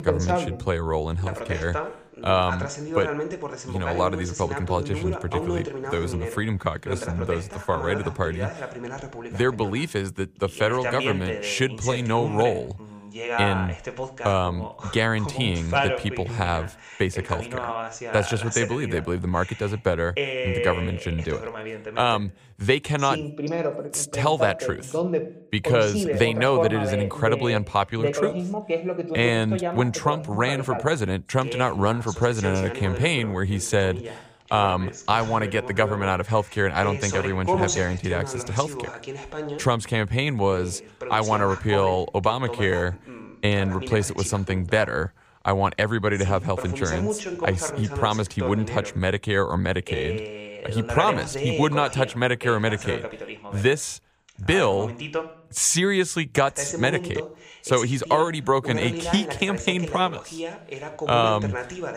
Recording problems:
voice in the background; loud; throughout; 7 dB below the speech

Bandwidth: 15 kHz